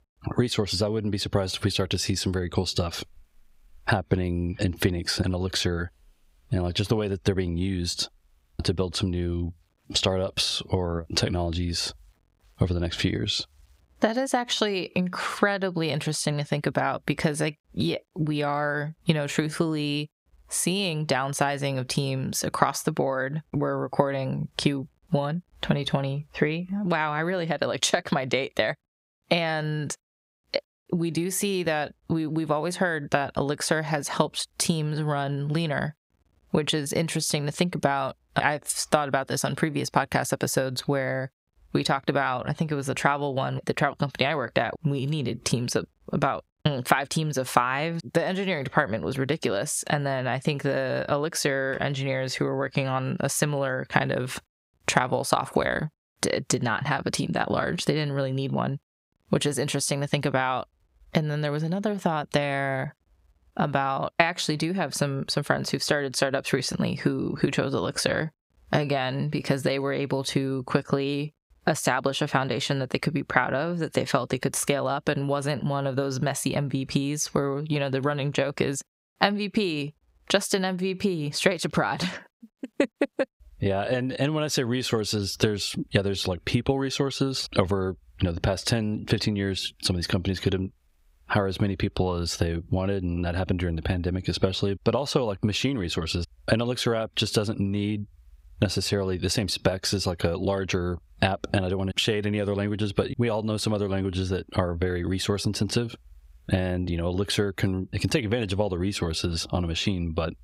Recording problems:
squashed, flat; somewhat

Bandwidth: 15.5 kHz